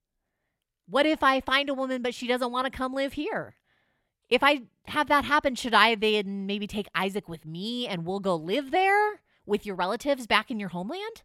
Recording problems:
none

